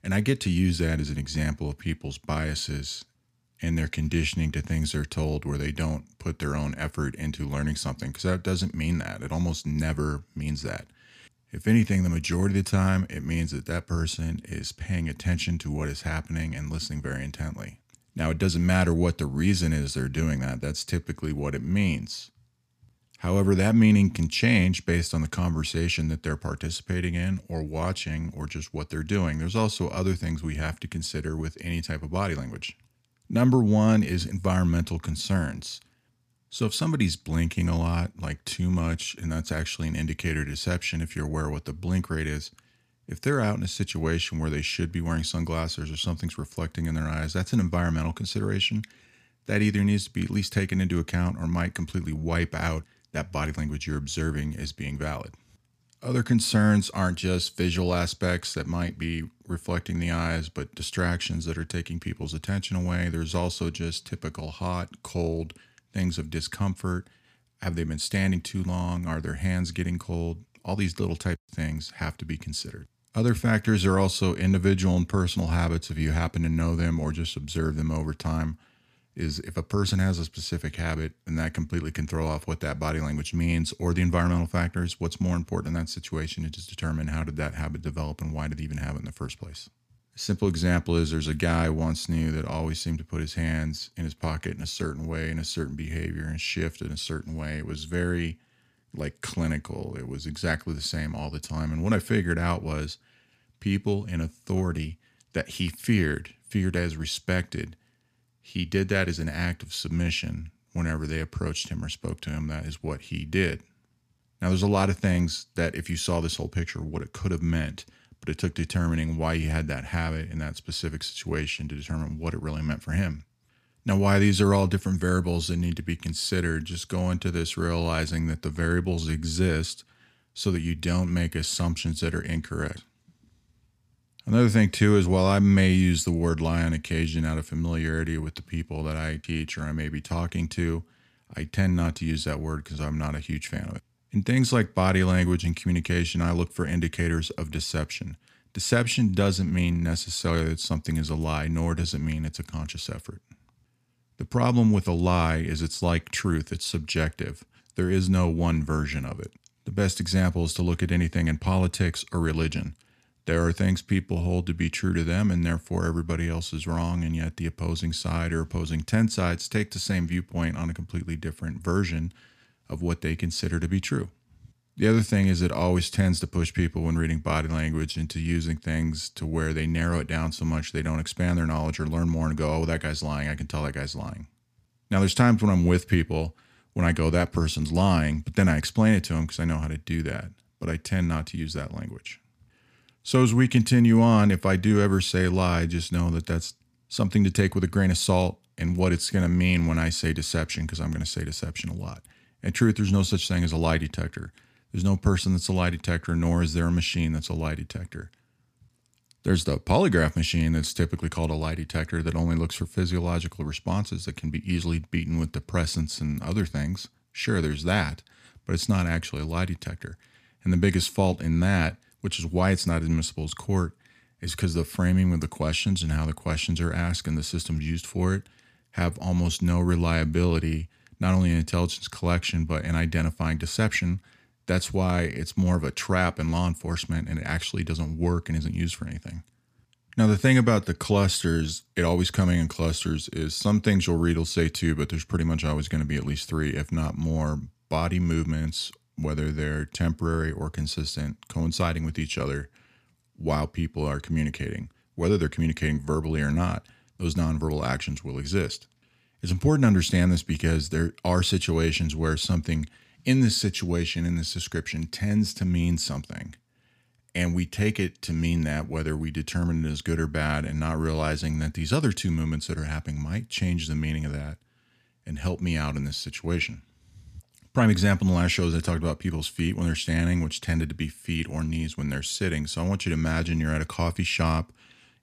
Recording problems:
none

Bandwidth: 14.5 kHz